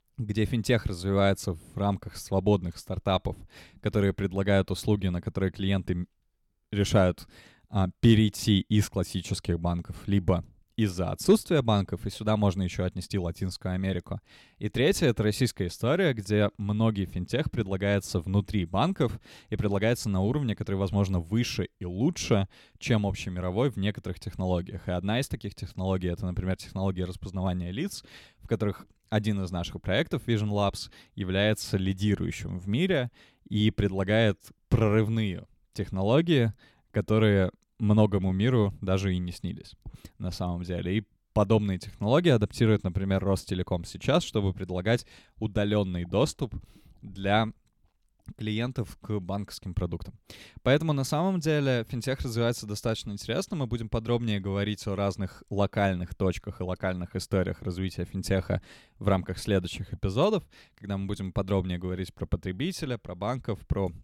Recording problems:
none

